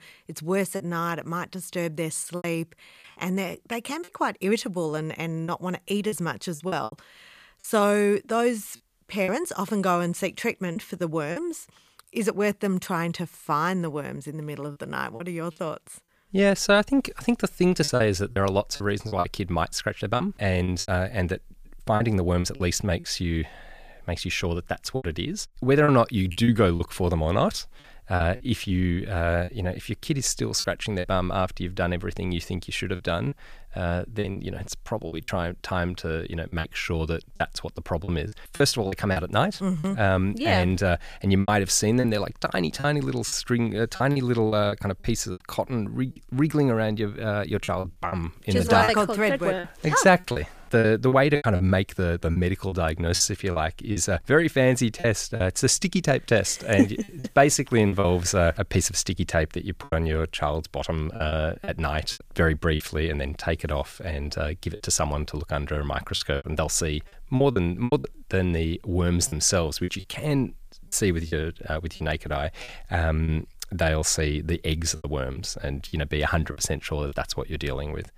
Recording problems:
choppy; very; 7% of the speech affected

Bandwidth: 15 kHz